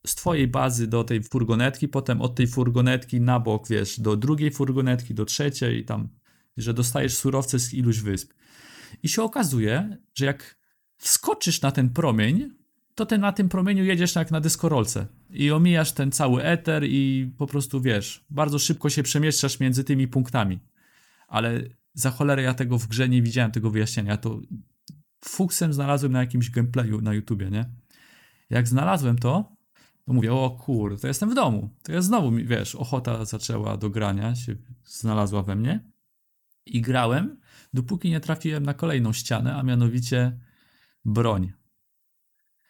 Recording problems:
uneven, jittery; slightly; from 10 to 37 s

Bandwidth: 18.5 kHz